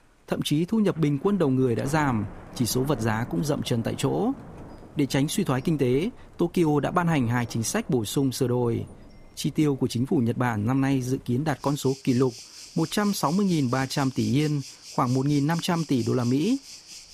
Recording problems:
rain or running water; noticeable; throughout; 20 dB below the speech

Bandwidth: 15 kHz